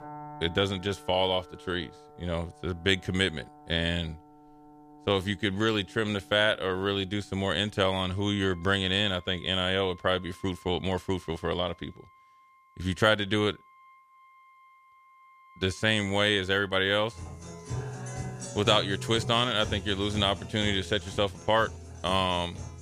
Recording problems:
background music; noticeable; throughout; 15 dB below the speech

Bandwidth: 14.5 kHz